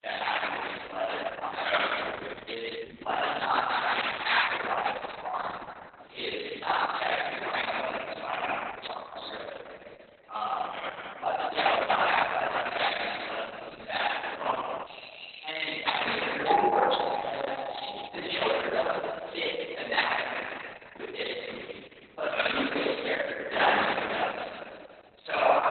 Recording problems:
room echo; strong; dies away in 2 s
off-mic speech; far
garbled, watery; badly; nothing above 4 kHz
thin; somewhat; fading below 650 Hz
jangling keys; faint; at 9 s; peak 10 dB below the speech
doorbell; faint; at 15 s; peak 10 dB below the speech
doorbell; loud; from 16 to 18 s; peak 4 dB above the speech

